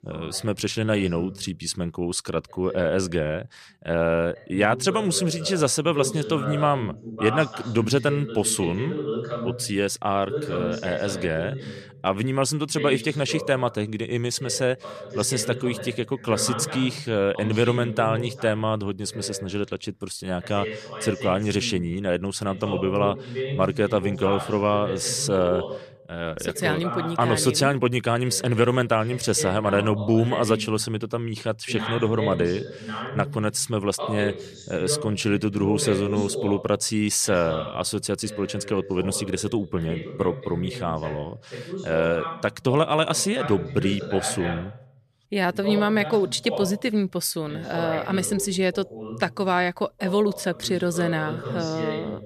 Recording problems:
voice in the background; loud; throughout; 9 dB below the speech

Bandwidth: 14.5 kHz